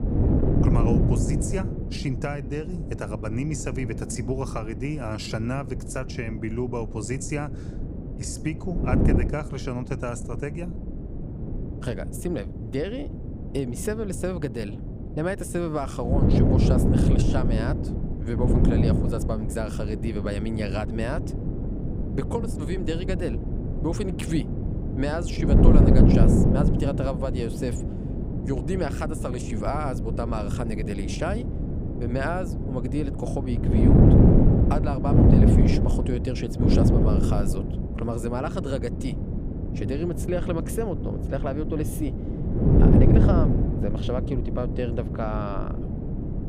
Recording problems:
wind noise on the microphone; heavy; 1 dB above the speech

